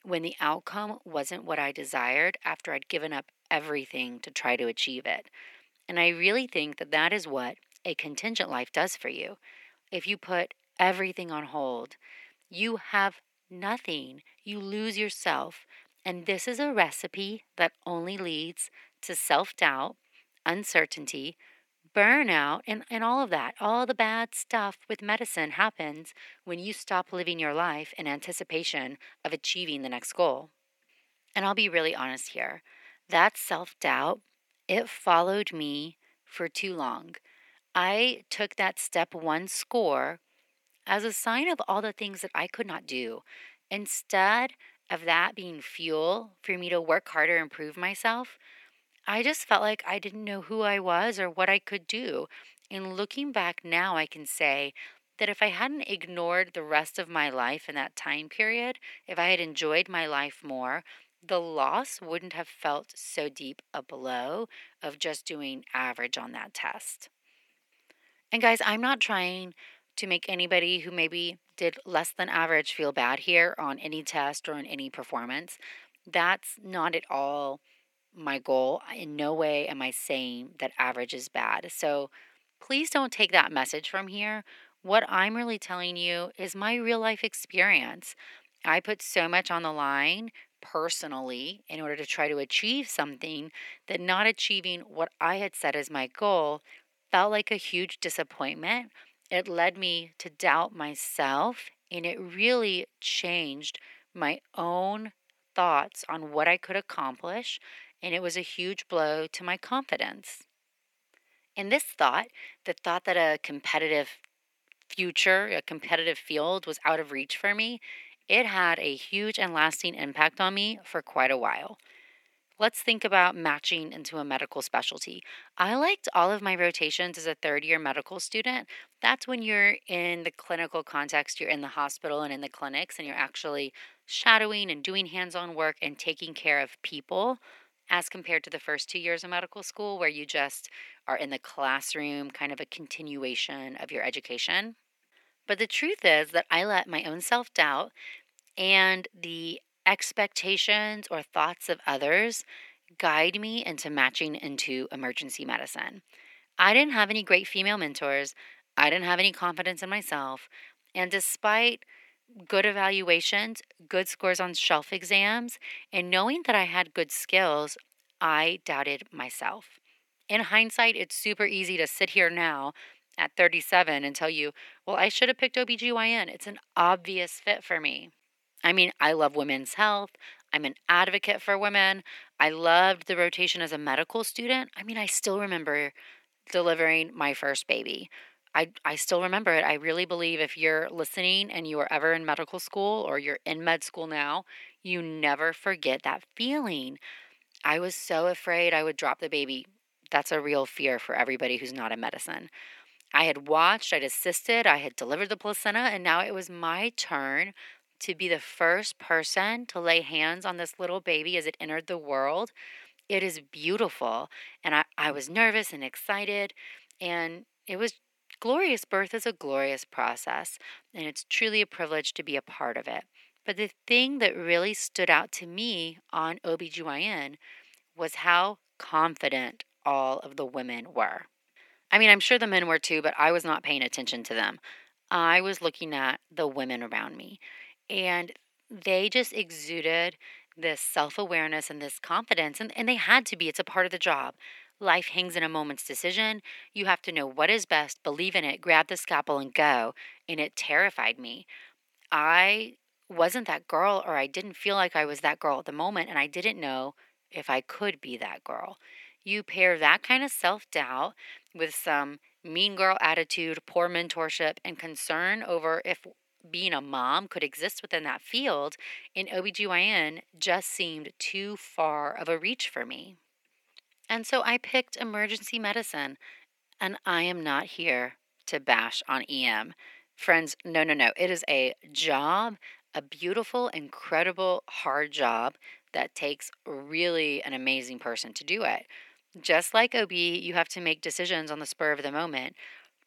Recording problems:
thin; very; fading below 550 Hz

